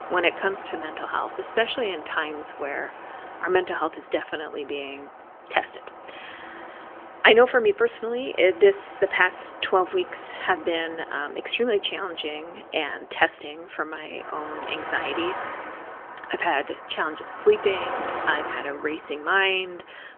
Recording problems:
phone-call audio; nothing above 3.5 kHz
traffic noise; noticeable; throughout; 15 dB below the speech

